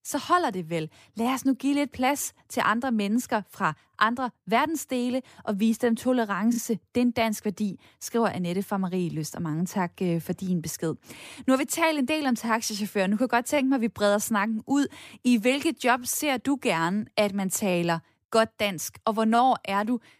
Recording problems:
none

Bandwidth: 15 kHz